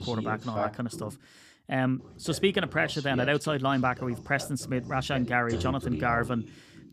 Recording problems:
voice in the background; loud; throughout; 10 dB below the speech

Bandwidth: 15 kHz